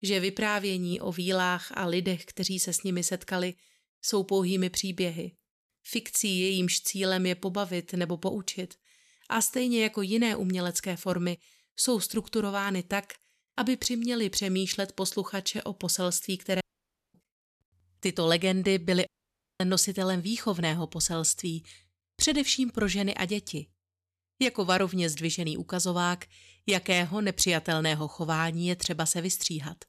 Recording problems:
audio cutting out; at 17 s for 0.5 s and at 19 s for 0.5 s

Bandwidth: 14 kHz